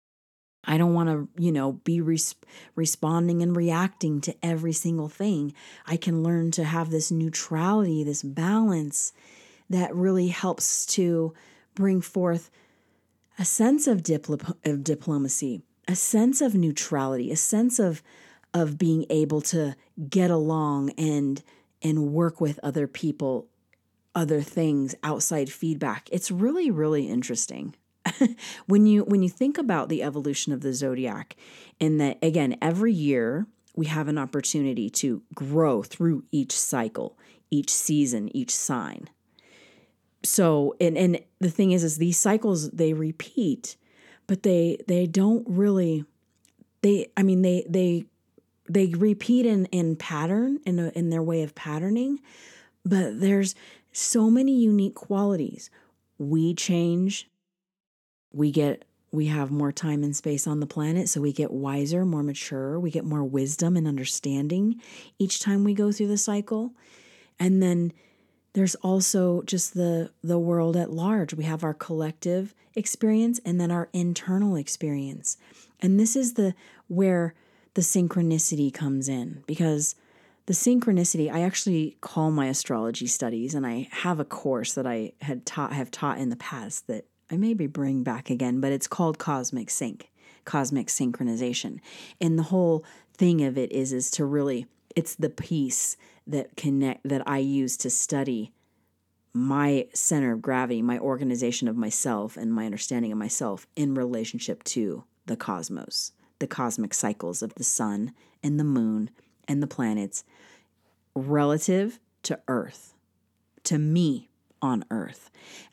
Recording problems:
none

